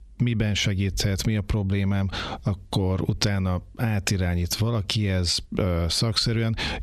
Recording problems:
squashed, flat; heavily

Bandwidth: 13.5 kHz